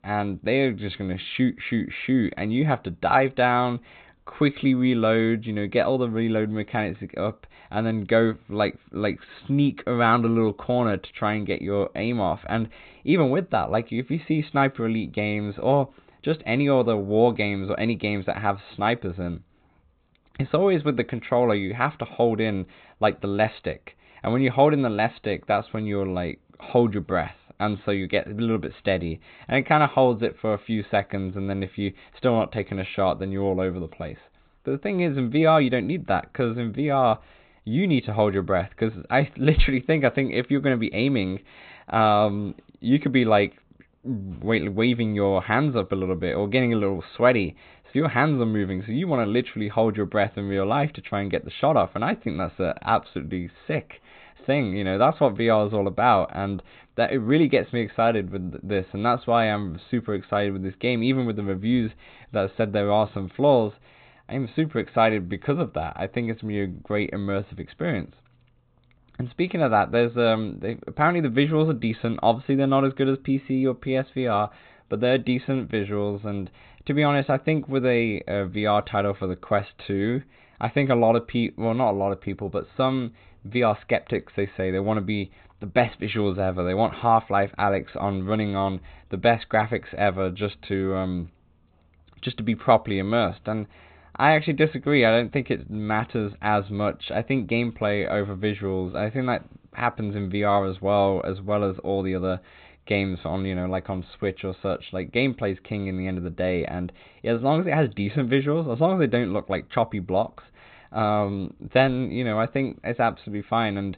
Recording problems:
high frequencies cut off; severe; nothing above 4 kHz

